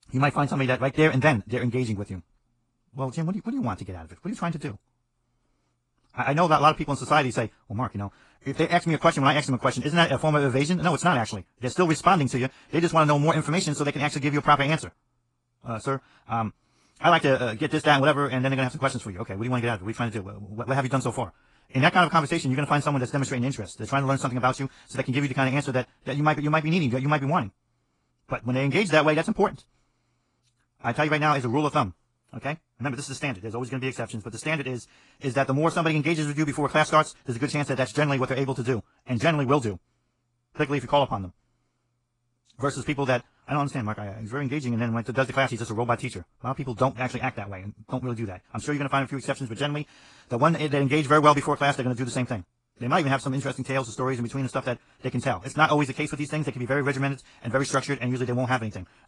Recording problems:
wrong speed, natural pitch; too fast; 1.6 times normal speed
garbled, watery; slightly

